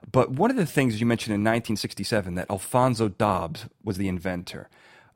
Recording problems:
uneven, jittery; strongly; from 0.5 to 4.5 s

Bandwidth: 16 kHz